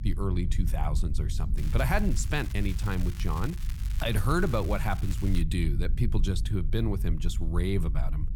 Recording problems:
low rumble; noticeable; throughout; 15 dB below the speech
crackling; noticeable; from 1.5 to 5.5 s; 15 dB below the speech

